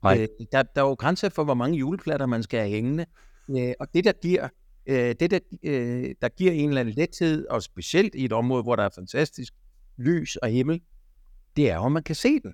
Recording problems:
none

